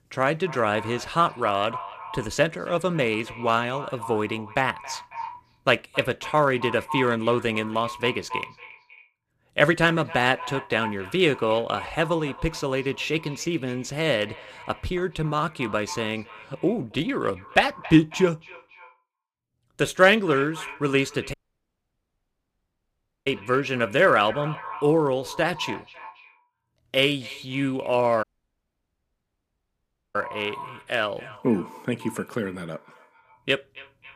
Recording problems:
echo of what is said; noticeable; throughout; 270 ms later, 15 dB below the speech
audio cutting out; at 21 s for 2 s and at 28 s for 2 s

